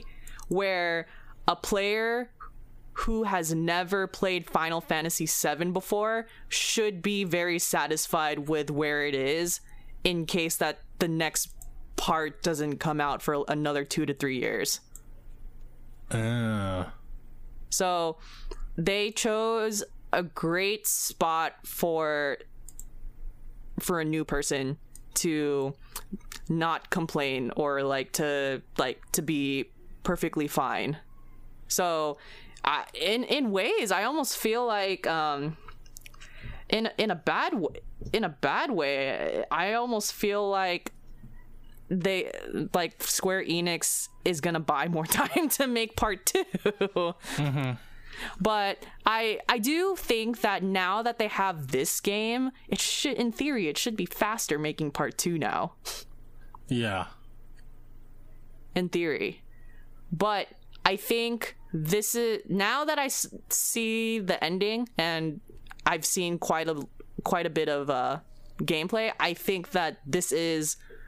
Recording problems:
squashed, flat; heavily
uneven, jittery; strongly; from 12 s to 1:04

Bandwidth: 15 kHz